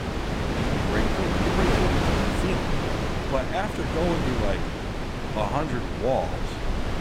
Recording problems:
wind noise on the microphone; heavy; 1 dB above the speech

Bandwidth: 16 kHz